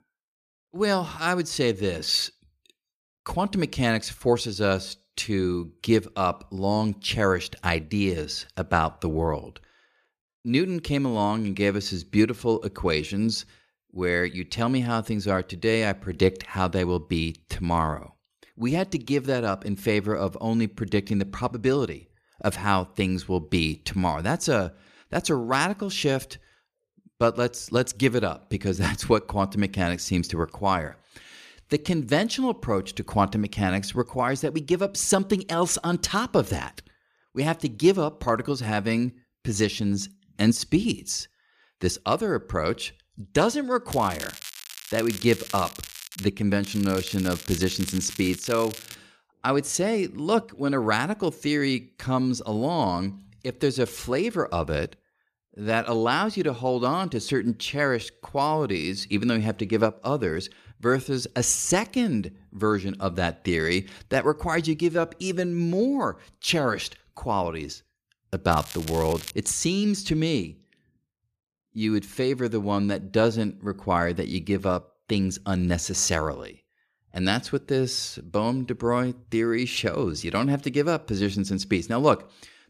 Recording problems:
crackling; noticeable; from 44 to 46 s, from 47 to 49 s and at 1:09; 10 dB below the speech

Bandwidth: 14.5 kHz